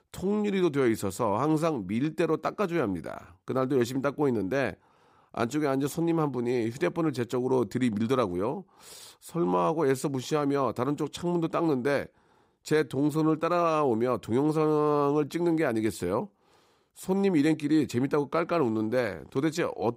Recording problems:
none

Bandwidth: 15.5 kHz